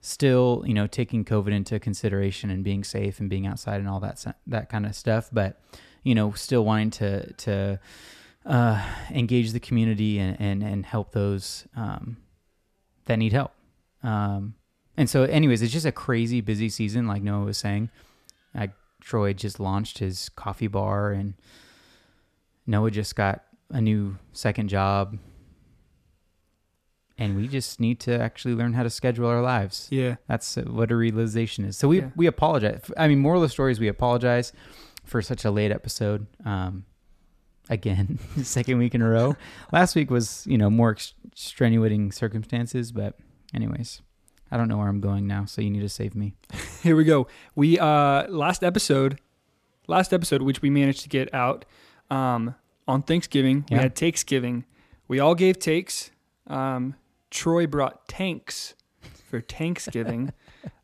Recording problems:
none

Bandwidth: 14.5 kHz